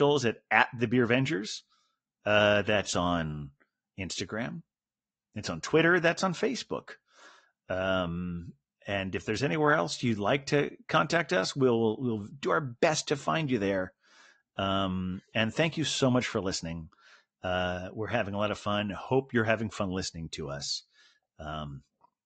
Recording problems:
high frequencies cut off; noticeable; nothing above 8 kHz
garbled, watery; slightly
abrupt cut into speech; at the start

